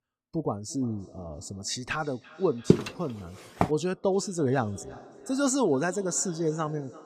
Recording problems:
echo of what is said; faint; throughout; 340 ms later, 20 dB below the speech
footsteps; loud; at 2.5 s; peak 5 dB above the speech

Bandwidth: 14.5 kHz